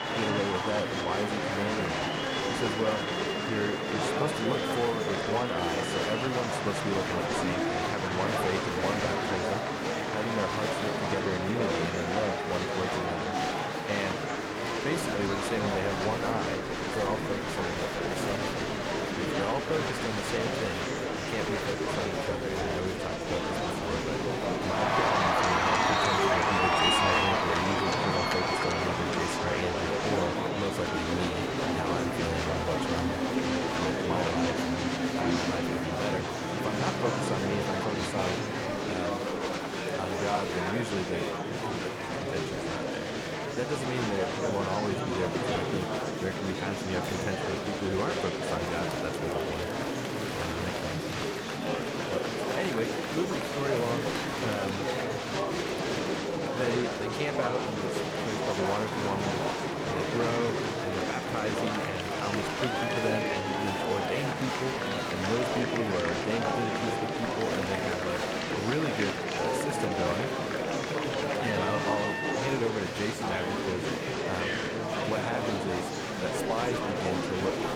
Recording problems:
crowd noise; very loud; throughout; 1 dB above the speech
murmuring crowd; very loud; throughout; 2 dB above the speech

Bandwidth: 18.5 kHz